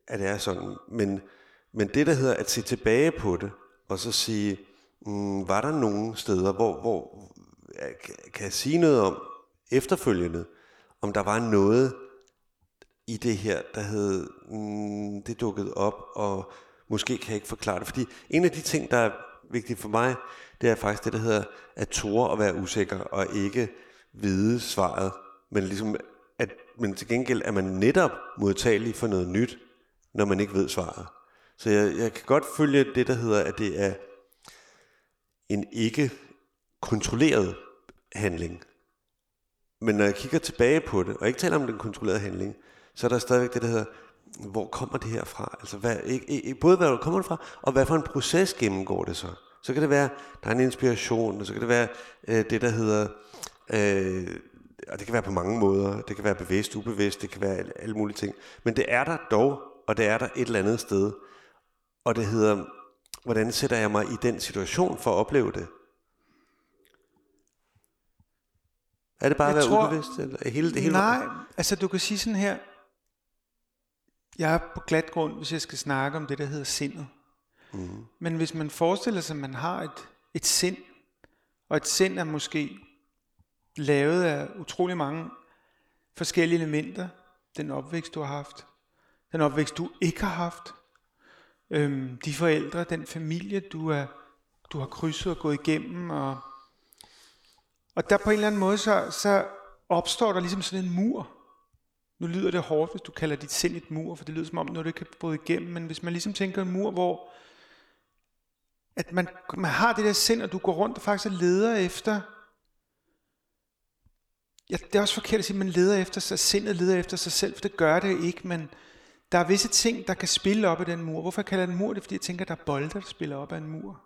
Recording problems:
echo of what is said; noticeable; throughout; 90 ms later, 20 dB below the speech

